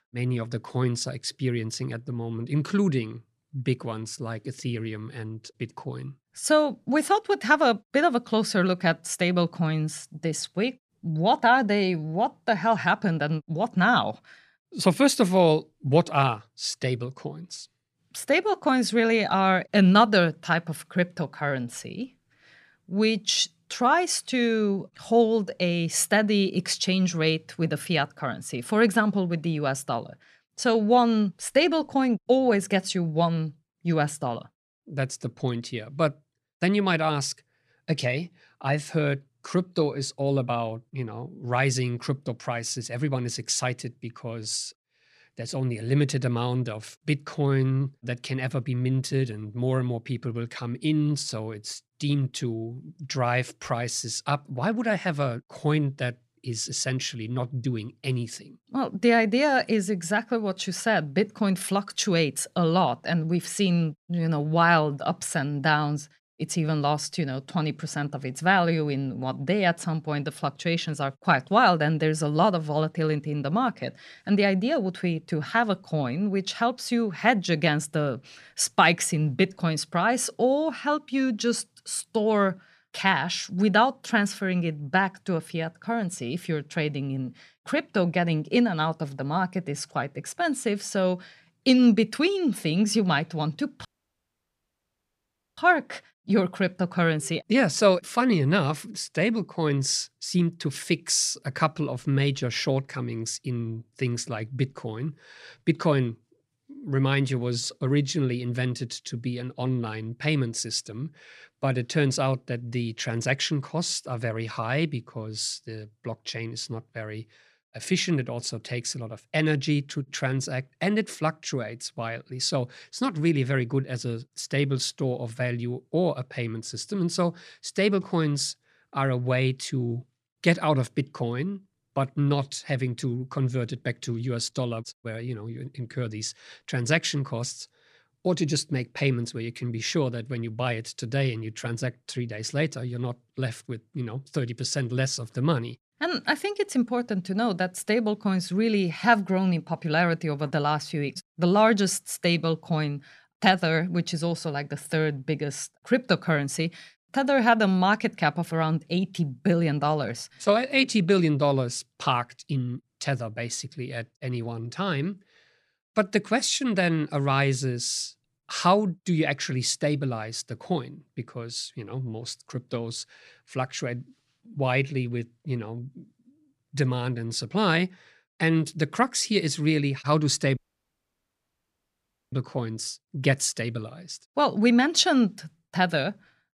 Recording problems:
audio cutting out; at 1:34 for 1.5 s and at 3:01 for 2 s

